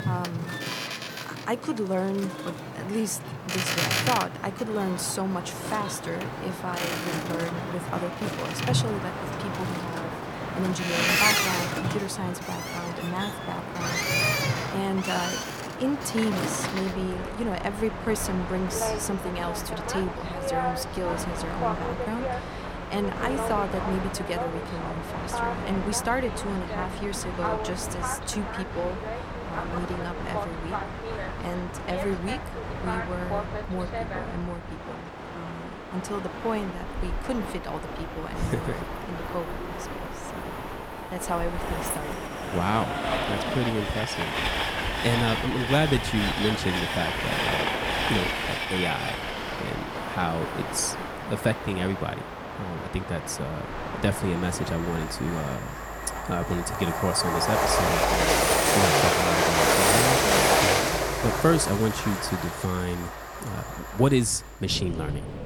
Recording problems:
train or aircraft noise; very loud; throughout; 2 dB above the speech
murmuring crowd; faint; throughout; 25 dB below the speech

